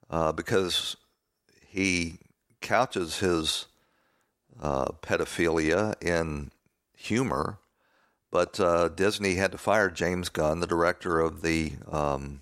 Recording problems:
none

